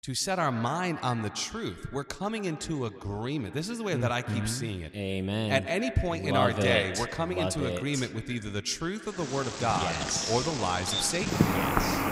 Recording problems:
echo of what is said; noticeable; throughout; 130 ms later, 10 dB below the speech
animal sounds; loud; from 9.5 s on; as loud as the speech

